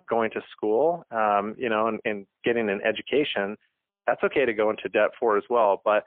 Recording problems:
phone-call audio; poor line; nothing above 3.5 kHz

